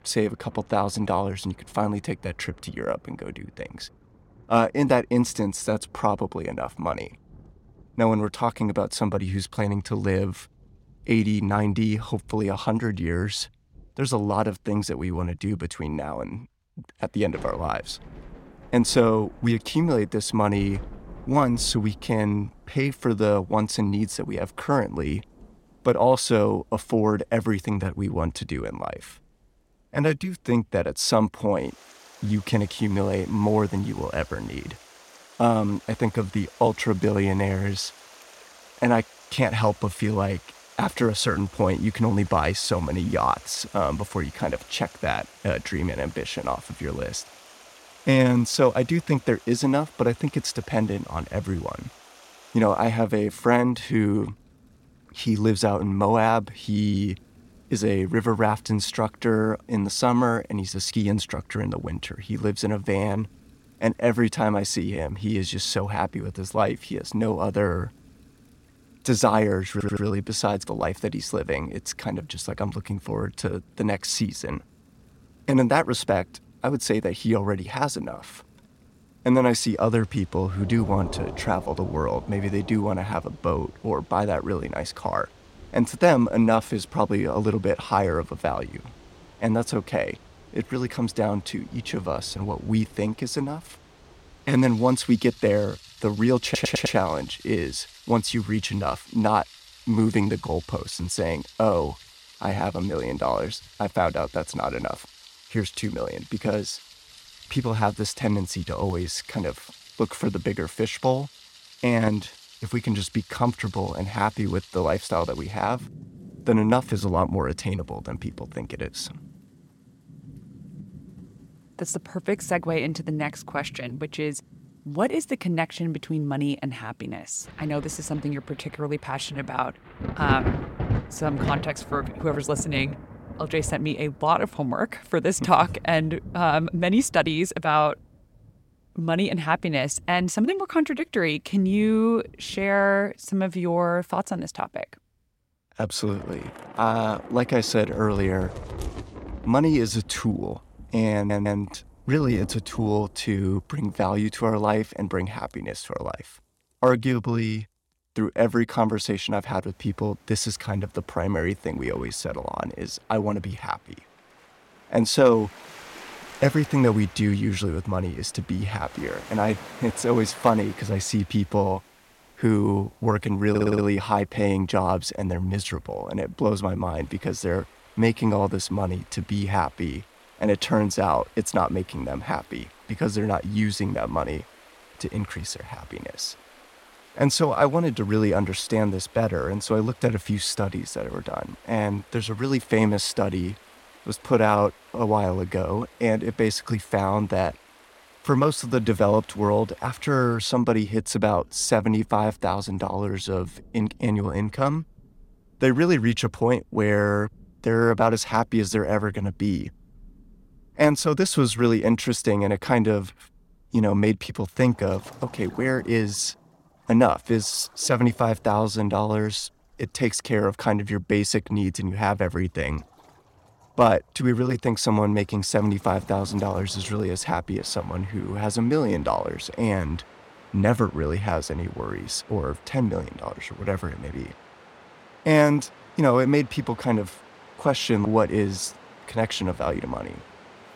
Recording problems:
rain or running water; noticeable; throughout; 20 dB below the speech
audio stuttering; 4 times, first at 1:10

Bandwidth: 16.5 kHz